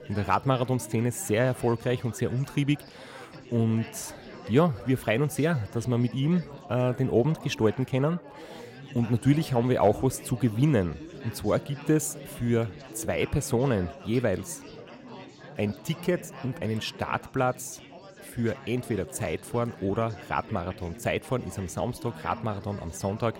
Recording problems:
chatter from many people; noticeable; throughout; 15 dB below the speech

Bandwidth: 16 kHz